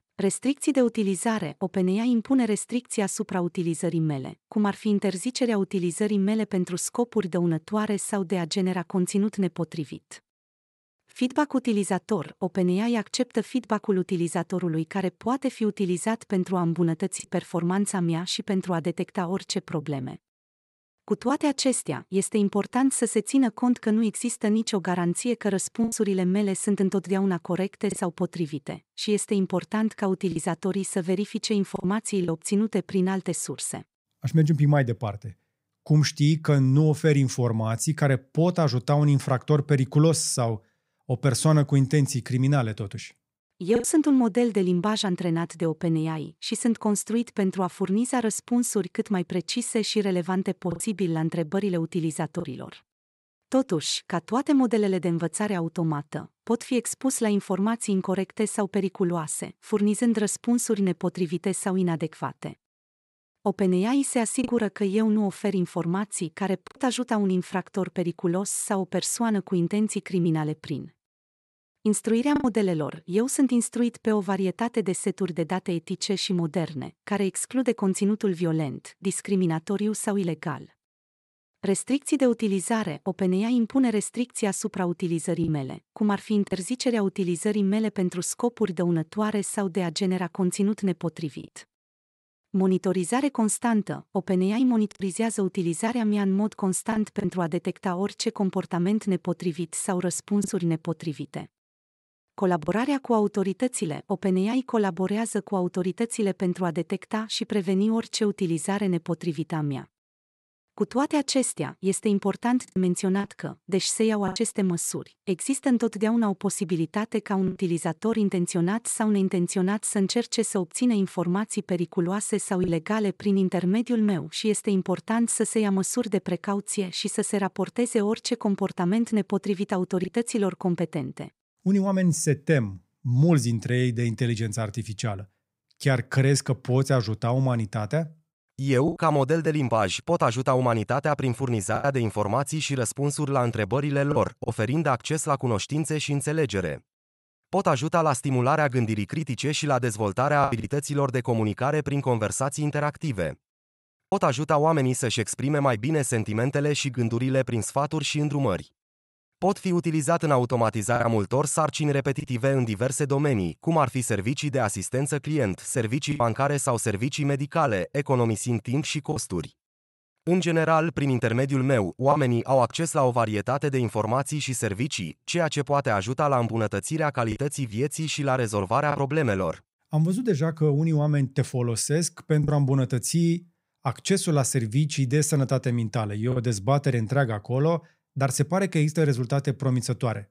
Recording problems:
choppy; occasionally; 1% of the speech affected

